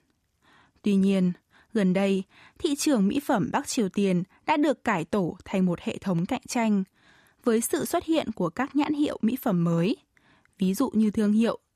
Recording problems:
none

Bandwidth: 14.5 kHz